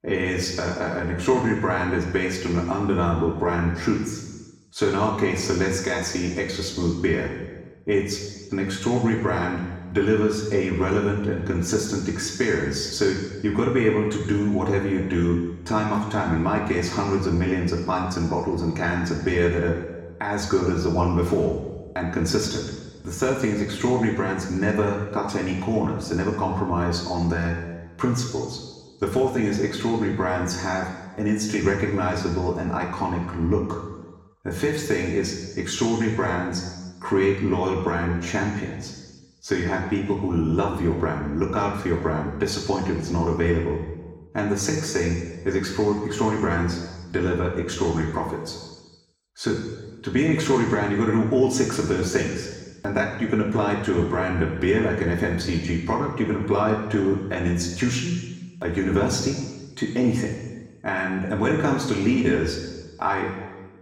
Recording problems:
room echo; noticeable; dies away in 1.2 s
off-mic speech; somewhat distant

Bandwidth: 17 kHz